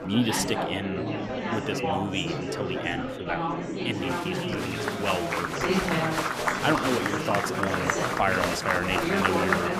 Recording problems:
murmuring crowd; very loud; throughout; 2 dB above the speech

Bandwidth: 14.5 kHz